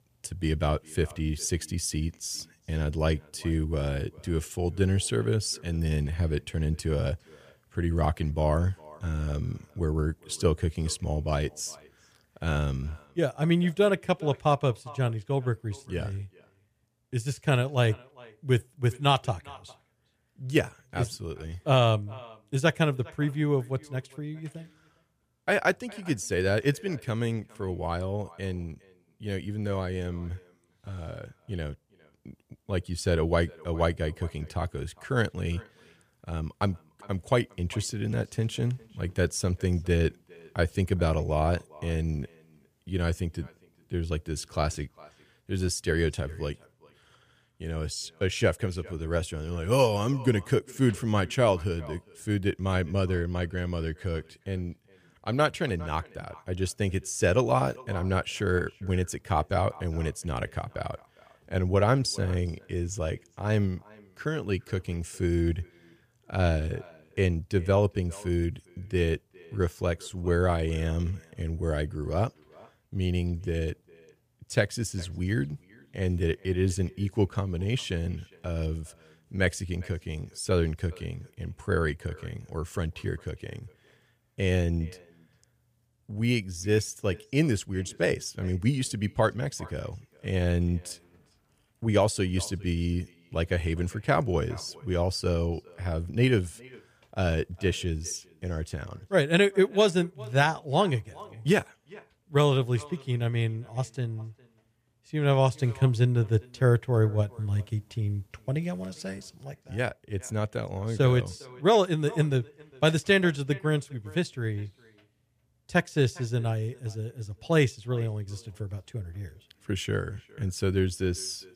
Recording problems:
echo of what is said; faint; throughout; 410 ms later, 25 dB below the speech

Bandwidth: 15 kHz